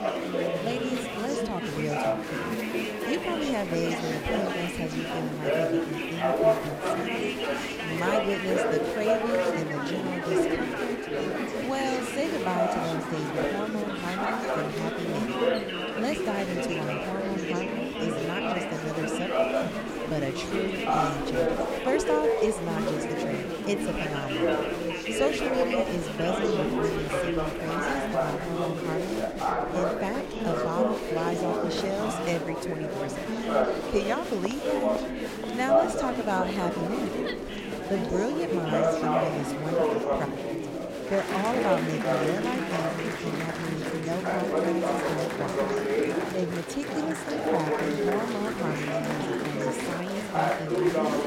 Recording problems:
chatter from many people; very loud; throughout; 4 dB above the speech
train or aircraft noise; faint; throughout; 25 dB below the speech

